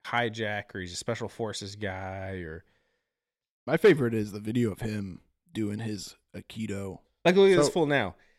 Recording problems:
none

